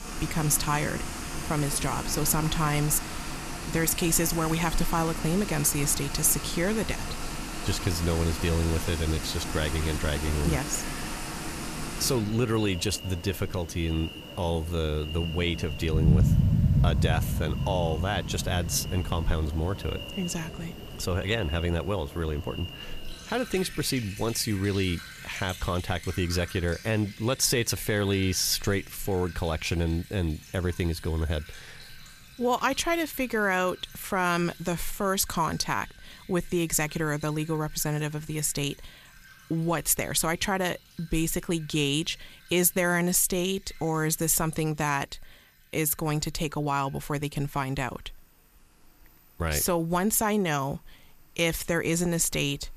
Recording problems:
rain or running water; loud; throughout; 6 dB below the speech

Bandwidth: 14.5 kHz